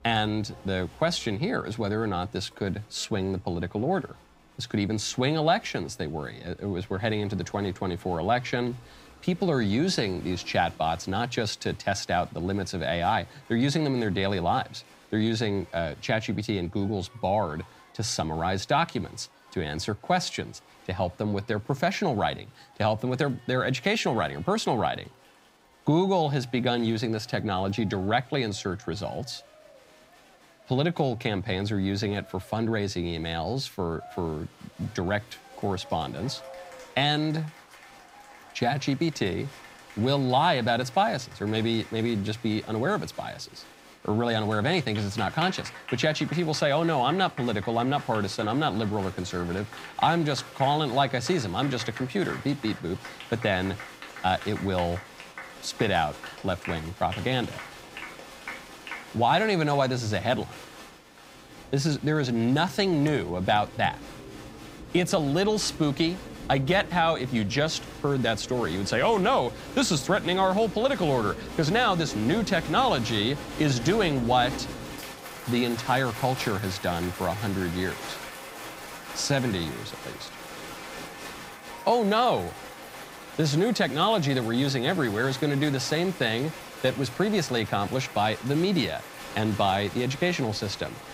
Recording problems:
crowd noise; noticeable; throughout; 15 dB below the speech

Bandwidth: 15.5 kHz